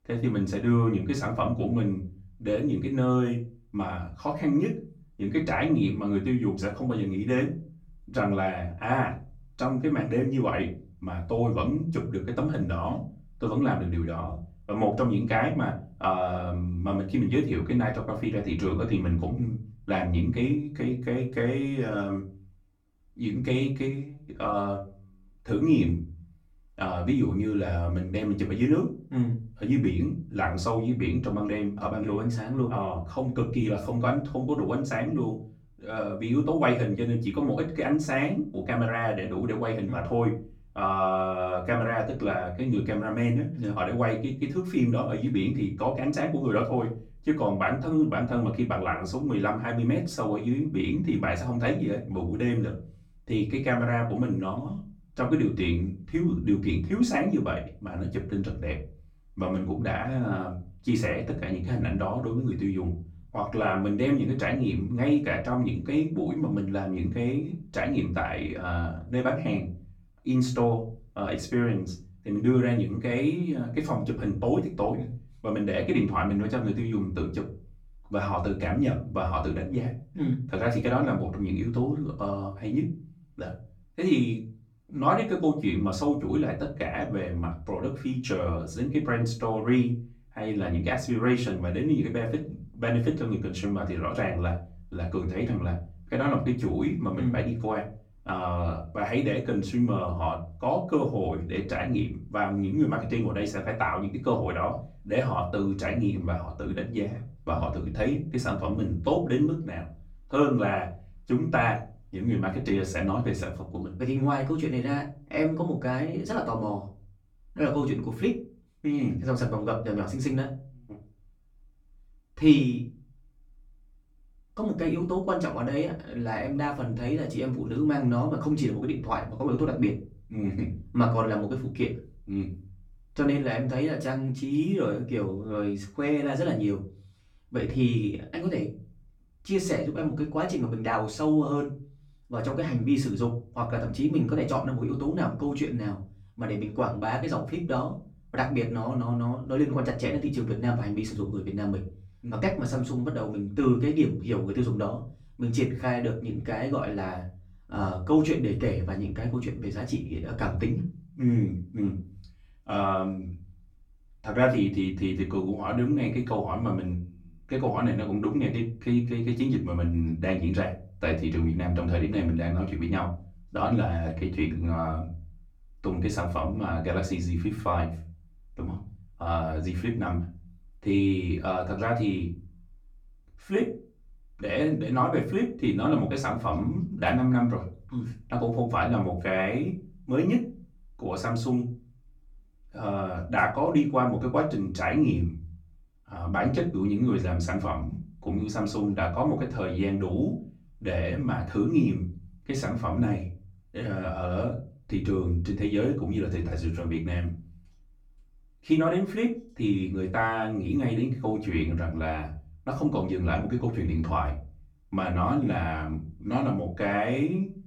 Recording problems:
off-mic speech; far
room echo; slight; dies away in 0.4 s

